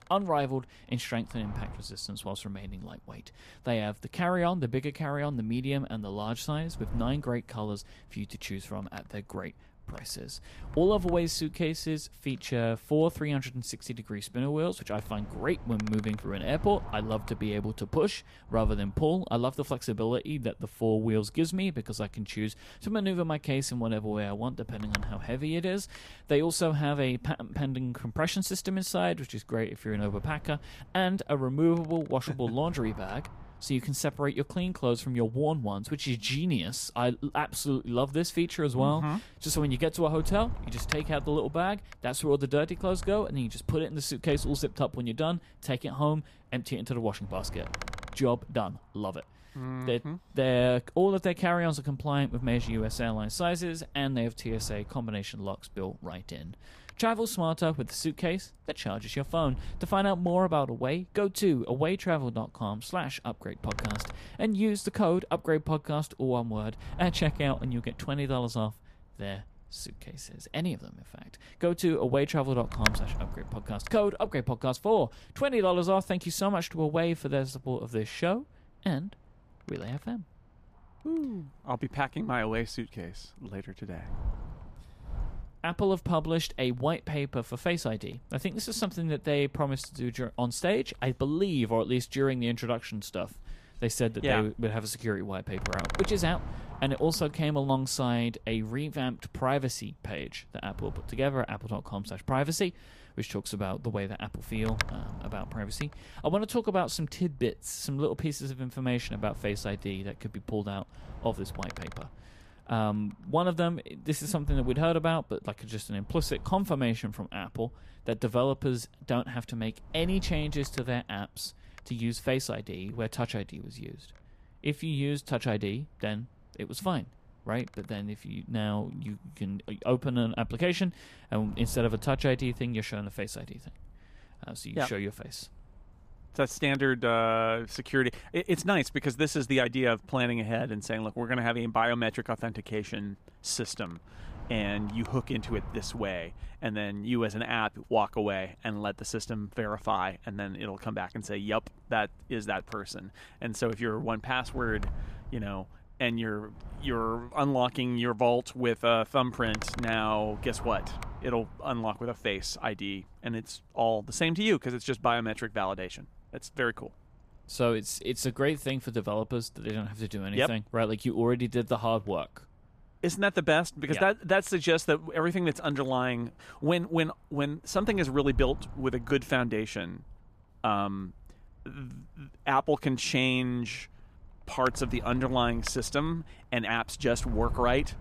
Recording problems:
wind noise on the microphone; occasional gusts; 10 dB below the speech

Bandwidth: 14.5 kHz